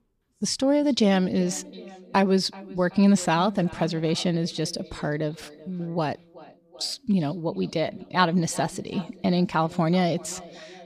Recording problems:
echo of what is said; faint; throughout; 380 ms later, 20 dB below the speech

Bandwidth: 14.5 kHz